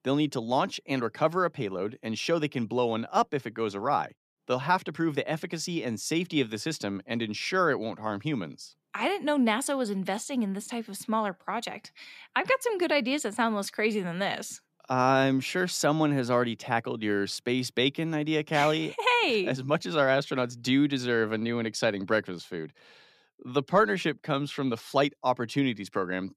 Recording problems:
none

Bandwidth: 14.5 kHz